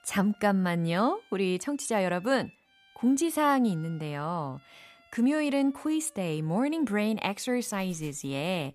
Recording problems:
background music; faint; throughout; 30 dB below the speech

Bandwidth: 14.5 kHz